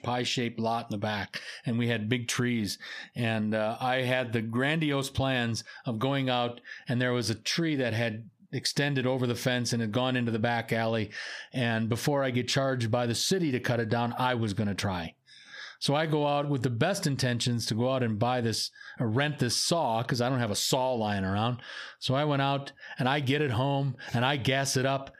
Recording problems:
squashed, flat; heavily

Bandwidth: 15 kHz